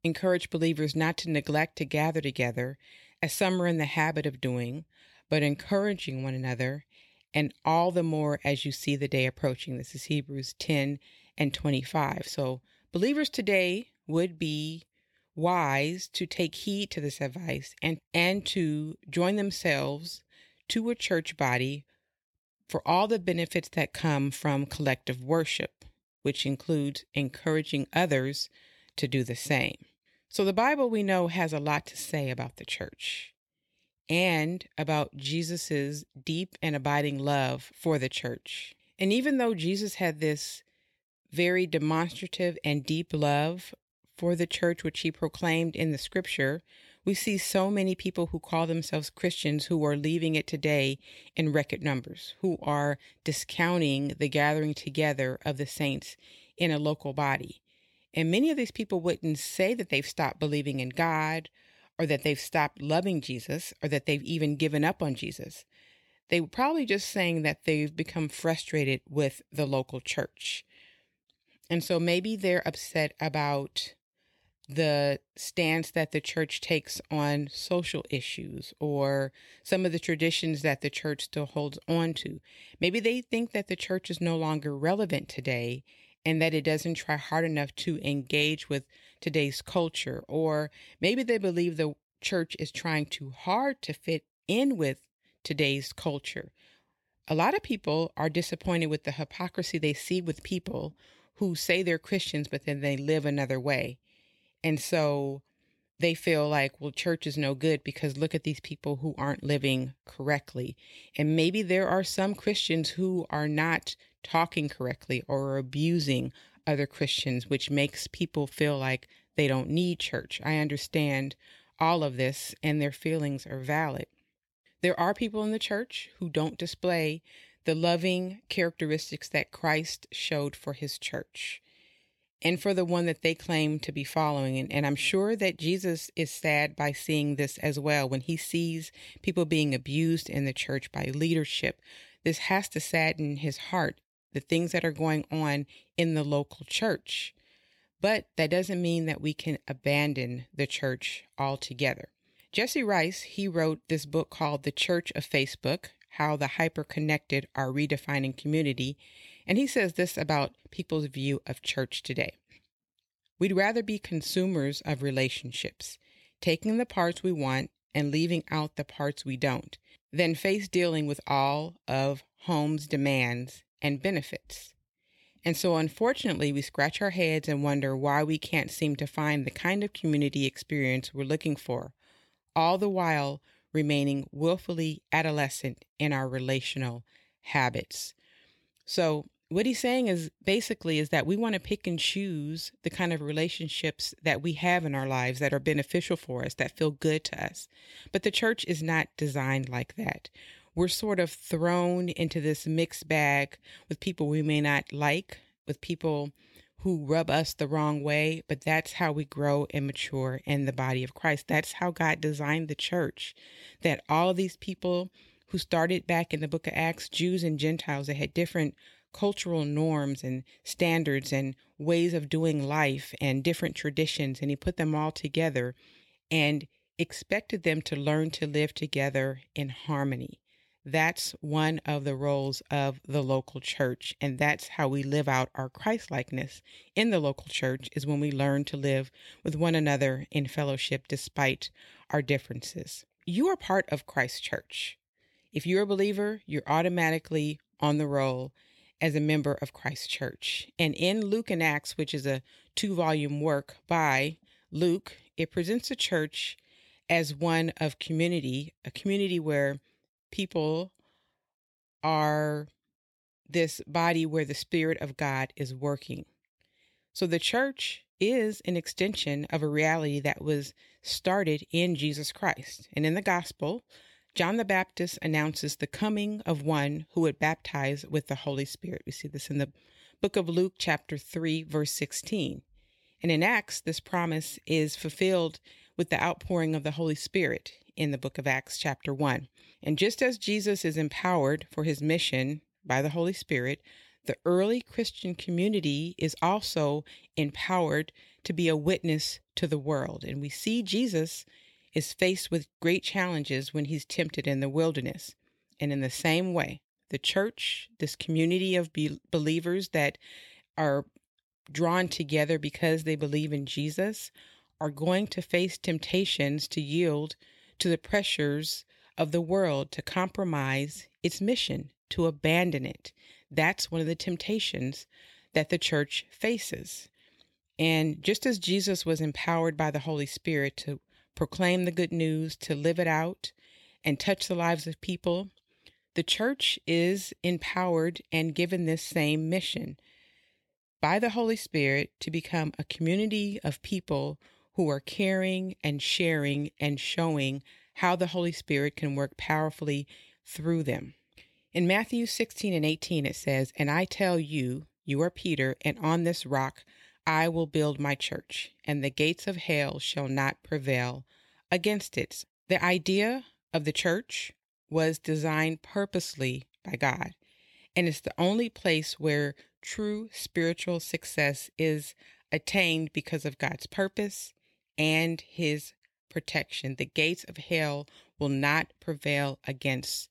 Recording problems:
none

